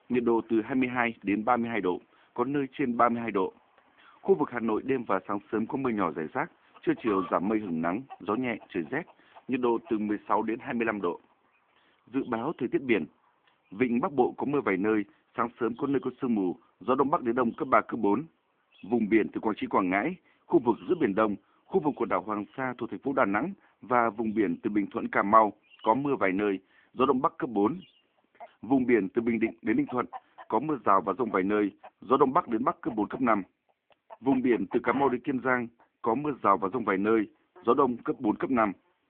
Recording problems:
phone-call audio
animal sounds; faint; throughout; 20 dB below the speech

